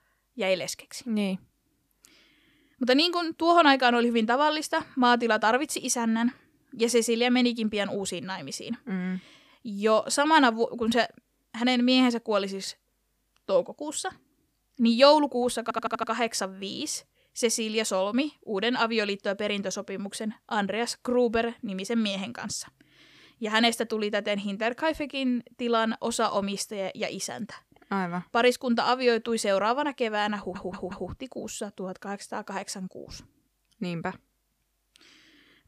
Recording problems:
audio stuttering; at 16 s and at 30 s

